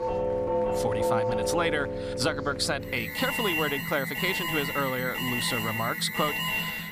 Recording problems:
alarms or sirens; very loud; throughout; 1 dB above the speech
murmuring crowd; faint; throughout; 20 dB below the speech

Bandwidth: 14.5 kHz